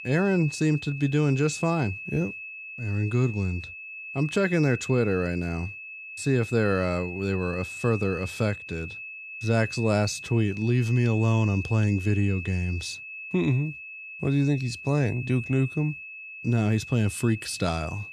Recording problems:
high-pitched whine; noticeable; throughout; 2.5 kHz, 10 dB below the speech

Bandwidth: 14 kHz